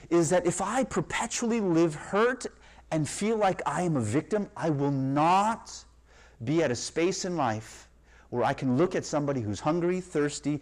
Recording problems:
distortion; slight; 10 dB below the speech

